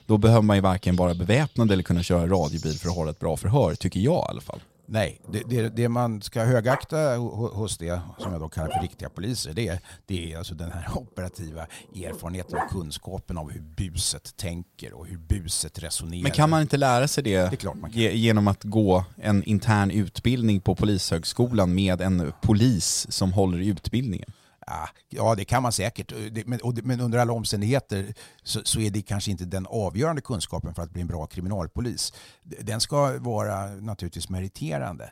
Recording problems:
animal sounds; noticeable; until 22 s; 15 dB below the speech

